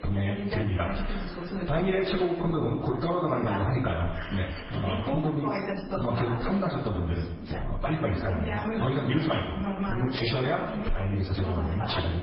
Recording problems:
echo of what is said; strong; throughout; 90 ms later, 10 dB below the speech
off-mic speech; far
garbled, watery; badly; nothing above 5 kHz
squashed, flat; heavily, background pumping
room echo; very slight; dies away in 0.2 s
background chatter; loud; throughout; 2 voices, 7 dB below the speech

